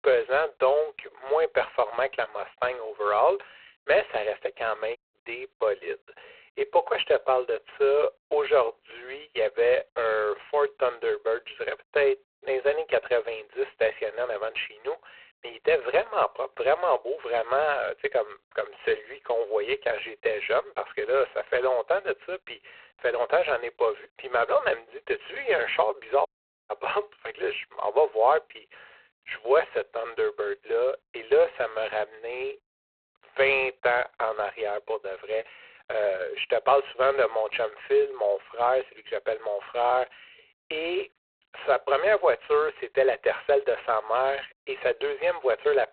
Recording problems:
phone-call audio; poor line; nothing above 4 kHz
audio cutting out; at 5 s and at 26 s

